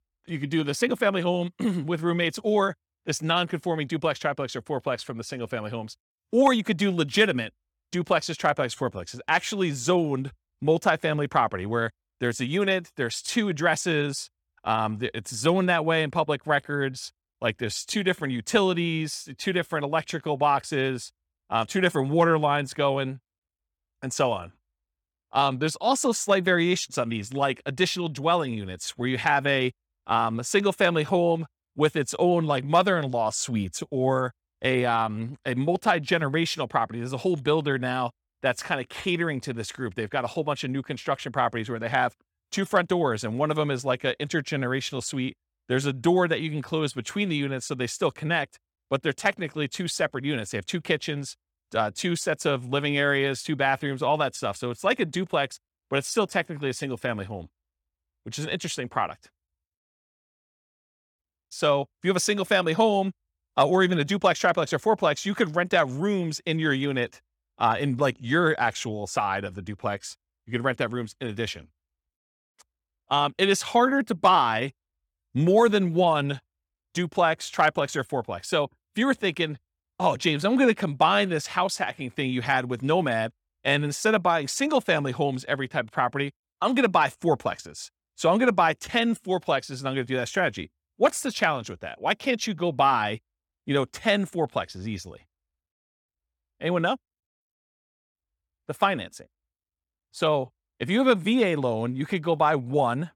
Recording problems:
none

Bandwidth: 18 kHz